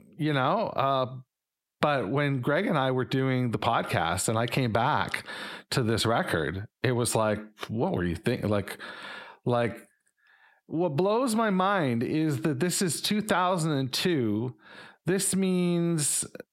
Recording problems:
squashed, flat; heavily

